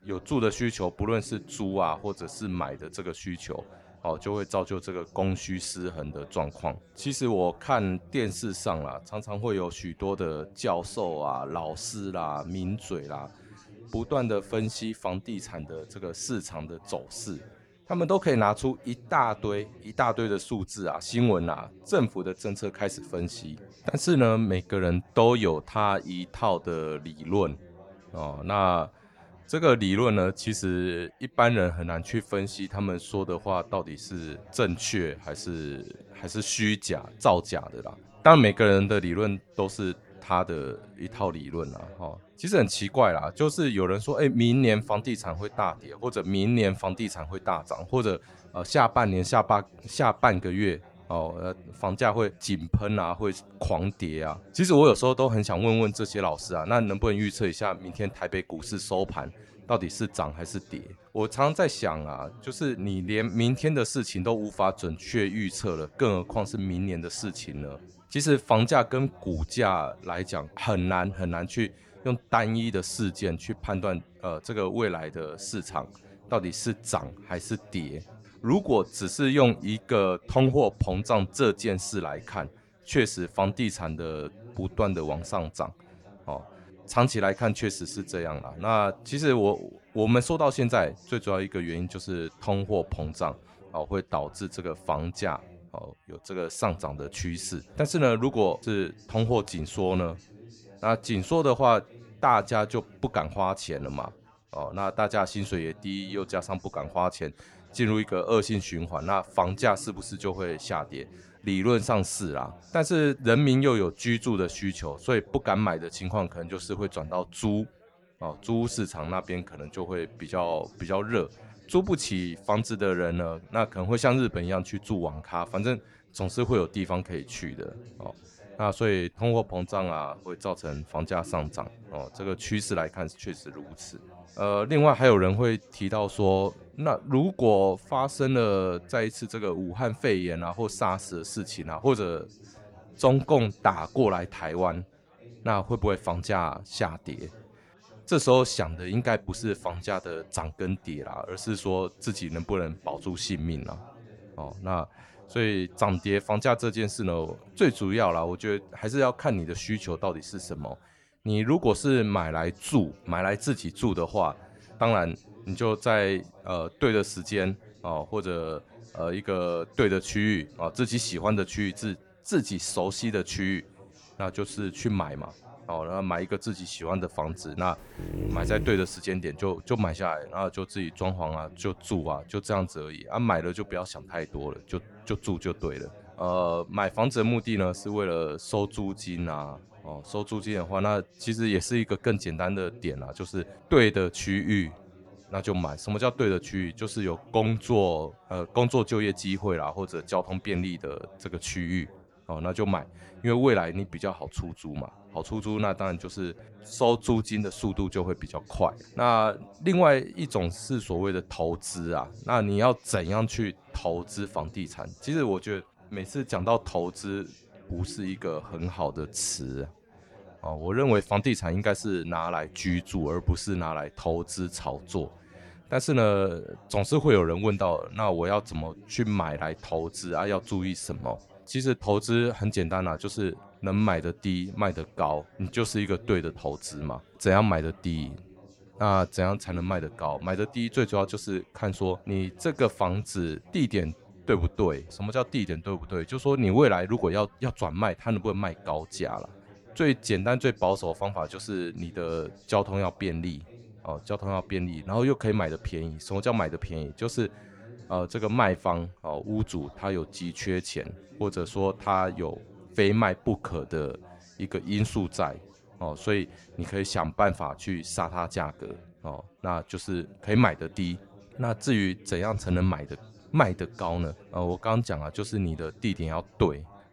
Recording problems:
background chatter; faint; throughout; 4 voices, 25 dB below the speech
dog barking; noticeable; at 2:58; peak 3 dB below the speech

